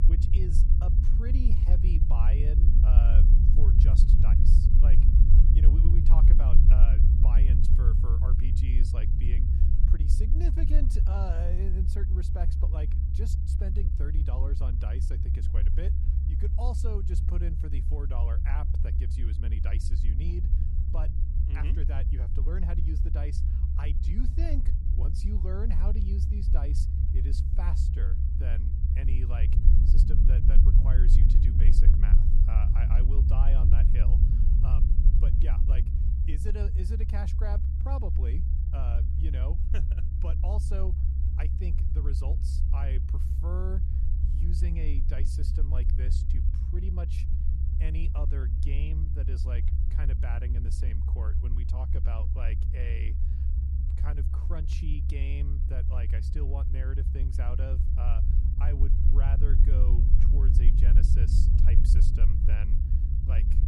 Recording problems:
low rumble; loud; throughout; as loud as the speech

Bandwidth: 14.5 kHz